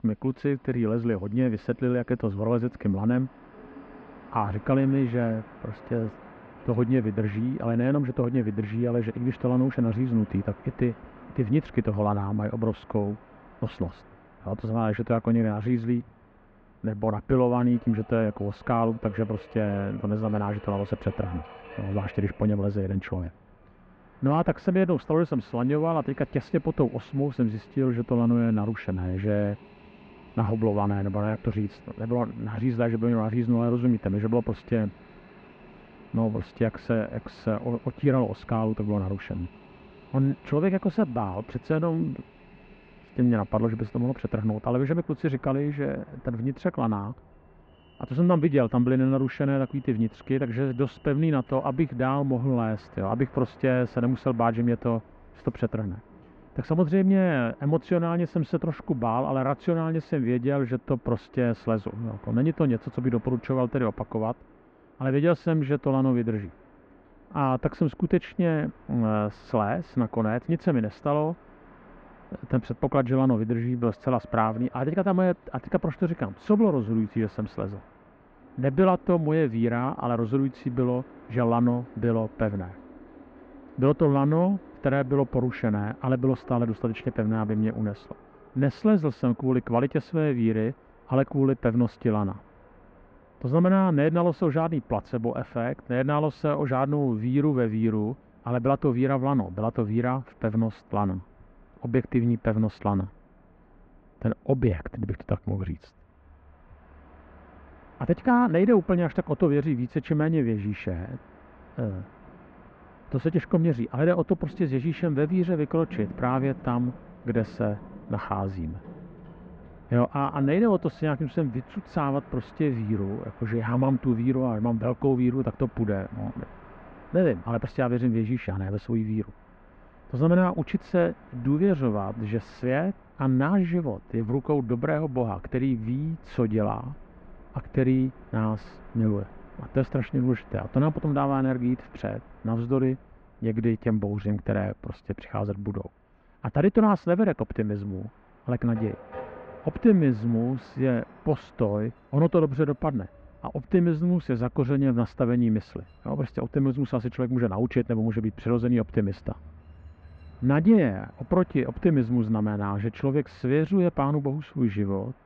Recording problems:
muffled; very; fading above 2.5 kHz
train or aircraft noise; faint; throughout; 25 dB below the speech

